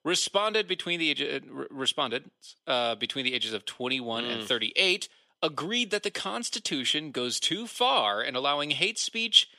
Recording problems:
thin; somewhat; fading below 400 Hz

